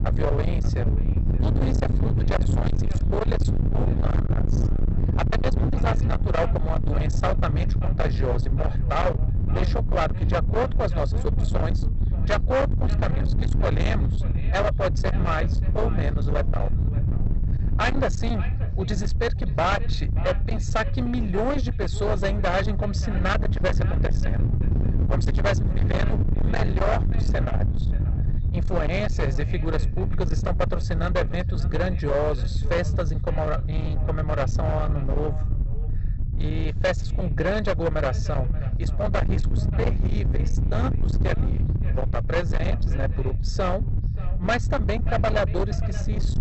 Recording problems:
distortion; heavy; 40% of the sound clipped
high frequencies cut off; noticeable; nothing above 8 kHz
echo of what is said; faint; throughout; 580 ms later, 20 dB below the speech
low rumble; loud; throughout; 7 dB below the speech

